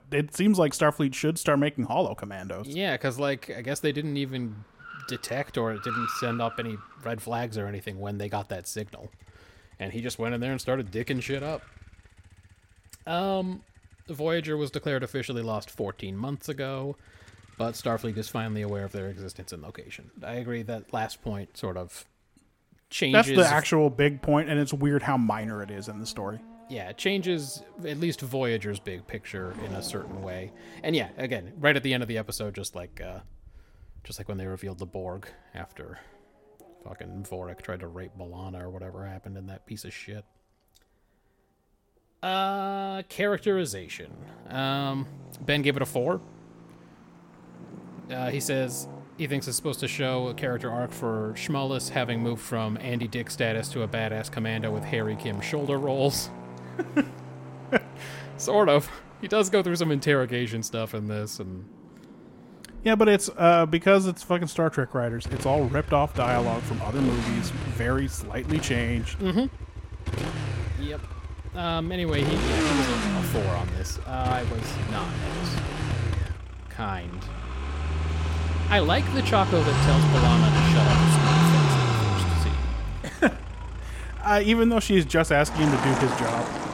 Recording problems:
traffic noise; loud; throughout; 1 dB below the speech

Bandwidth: 16.5 kHz